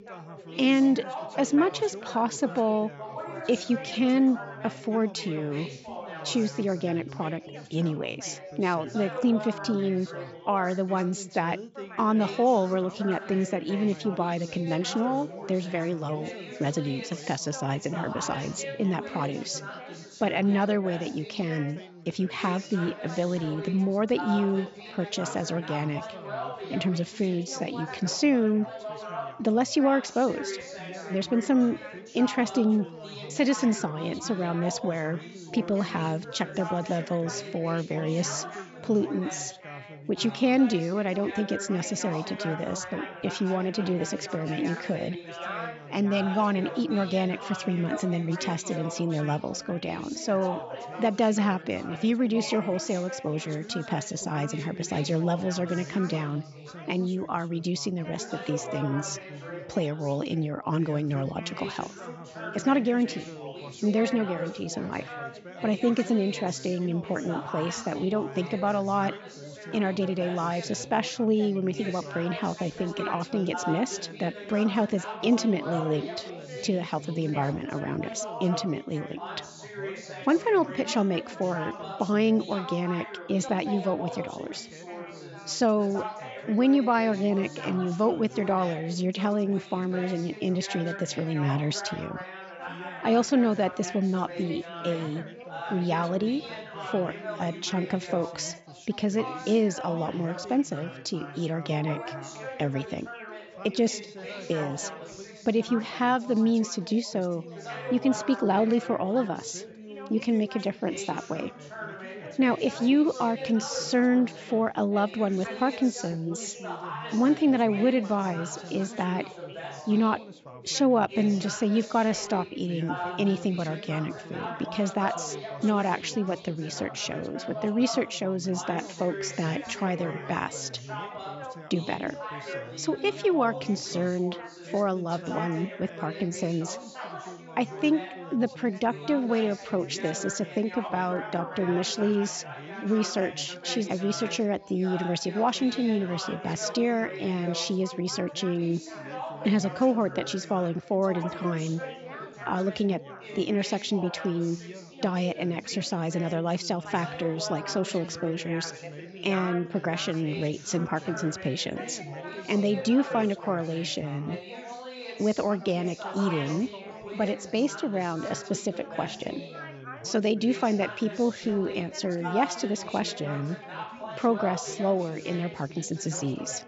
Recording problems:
high frequencies cut off; noticeable; nothing above 8 kHz
background chatter; noticeable; throughout; 4 voices, 10 dB below the speech

